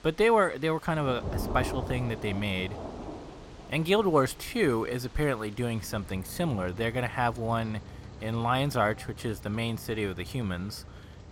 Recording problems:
rain or running water; noticeable; throughout; 15 dB below the speech

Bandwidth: 16.5 kHz